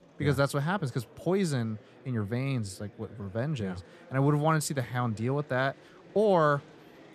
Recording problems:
murmuring crowd; faint; throughout; 25 dB below the speech

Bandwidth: 14.5 kHz